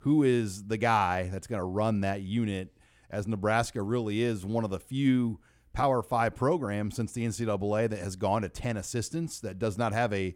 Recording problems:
none

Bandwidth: 18 kHz